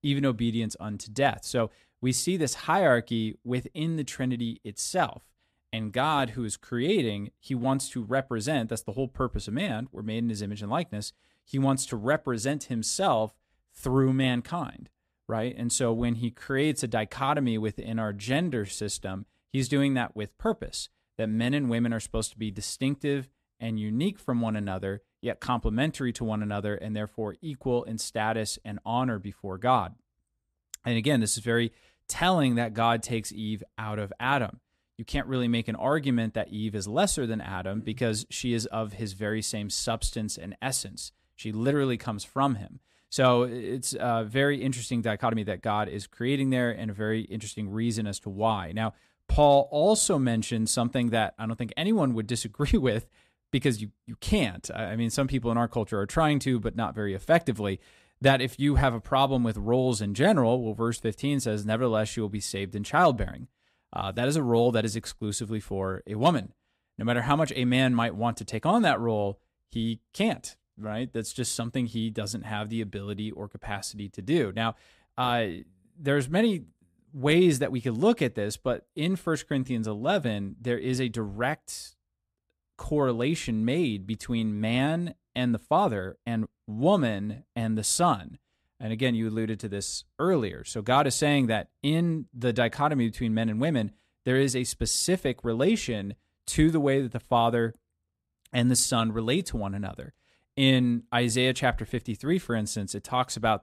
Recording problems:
uneven, jittery; strongly; from 16 s to 1:27

